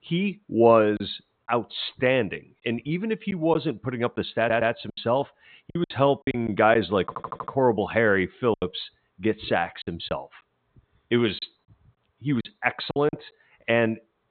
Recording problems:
high frequencies cut off; severe; nothing above 4 kHz
garbled, watery; slightly
choppy; very; 7% of the speech affected
audio stuttering; at 4.5 s and at 7 s

